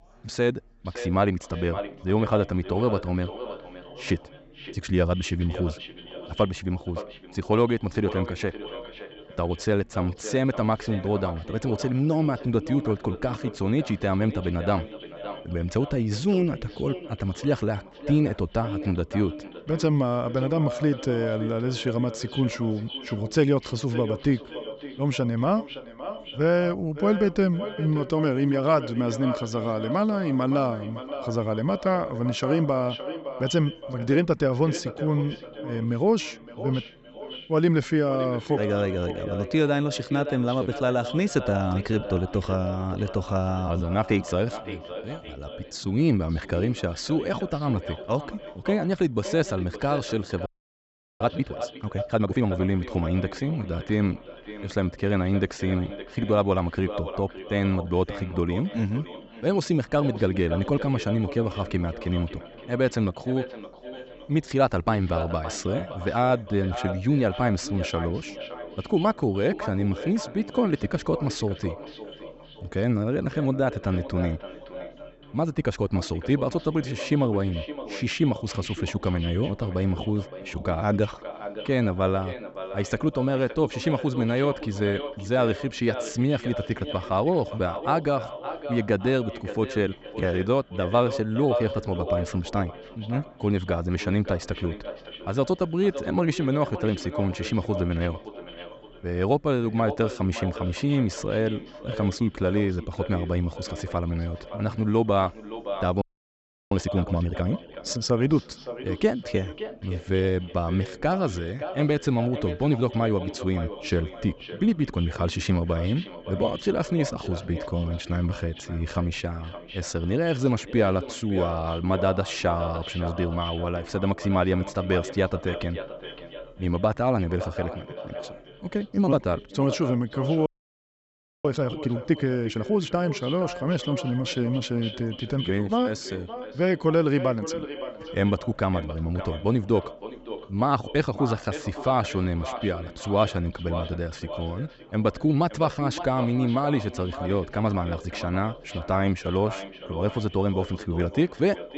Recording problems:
echo of what is said; strong; throughout; 570 ms later, 10 dB below the speech
high frequencies cut off; noticeable; nothing above 8 kHz
chatter from many people; faint; throughout; 30 dB below the speech
audio freezing; at 50 s for 0.5 s, at 1:46 for 0.5 s and at 2:10 for 1 s

